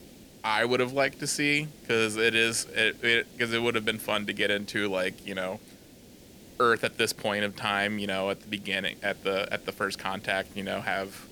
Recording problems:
hiss; faint; throughout; 20 dB below the speech

